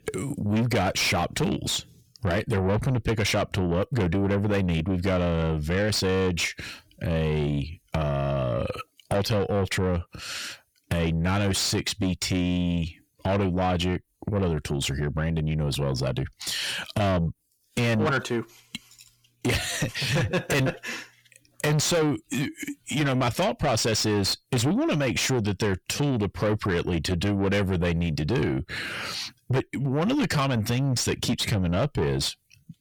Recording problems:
distortion; heavy; 6 dB below the speech

